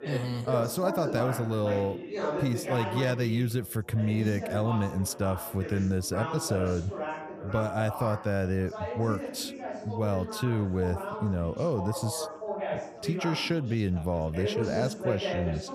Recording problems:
background chatter; loud; throughout; 4 voices, 6 dB below the speech

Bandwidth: 15 kHz